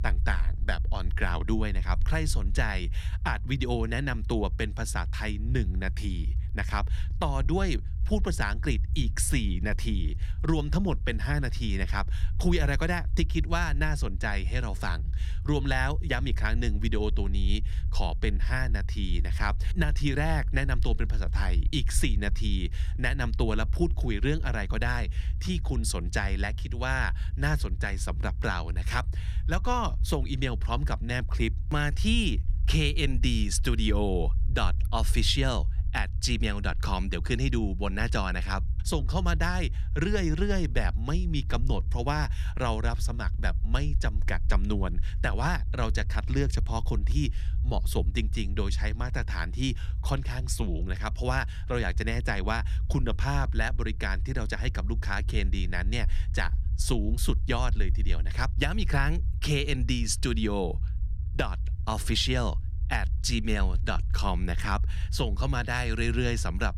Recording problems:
low rumble; noticeable; throughout; 20 dB below the speech

